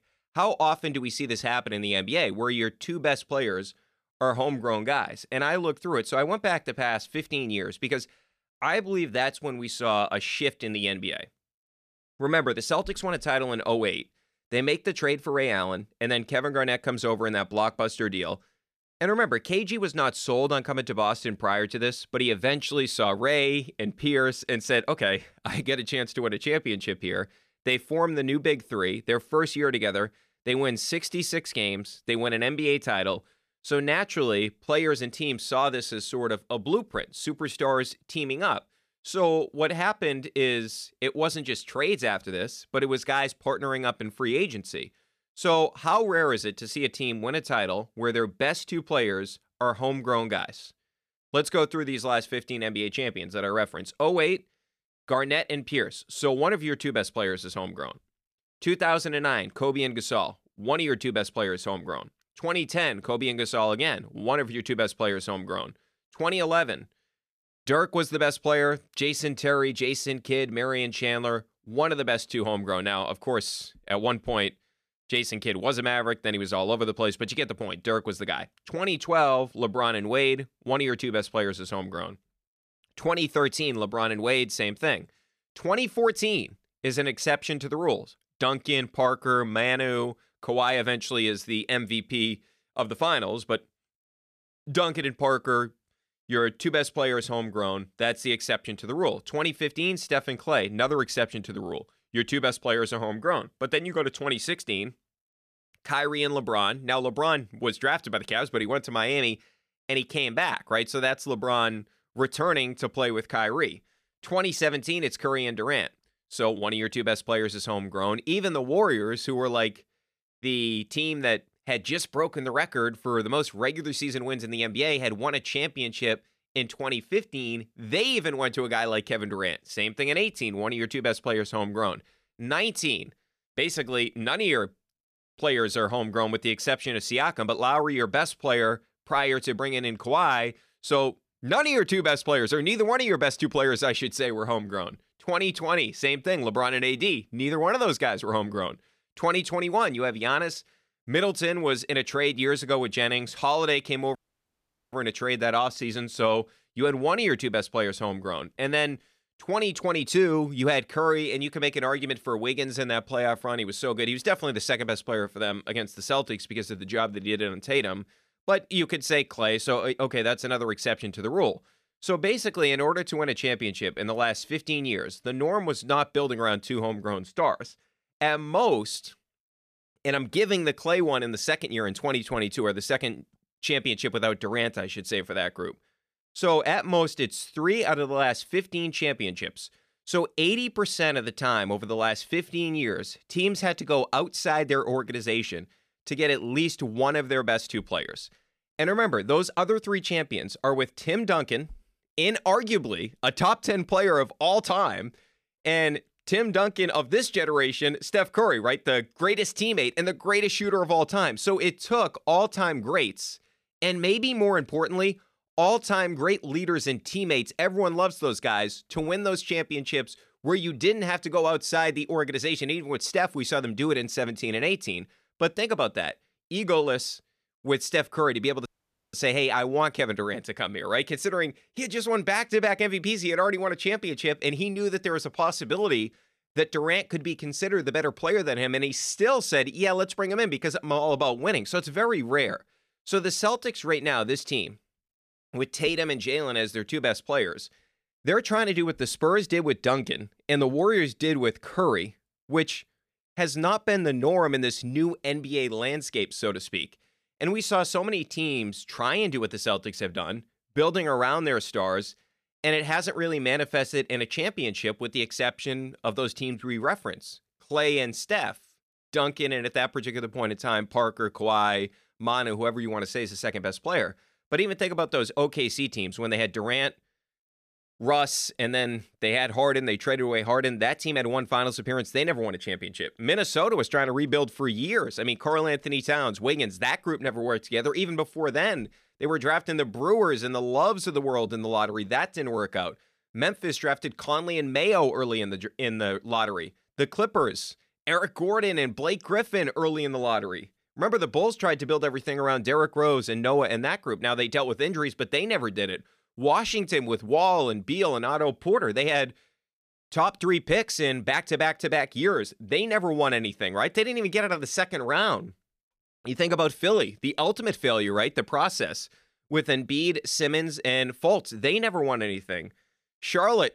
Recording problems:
audio cutting out; at 2:34 for 1 s and at 3:49

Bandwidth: 14.5 kHz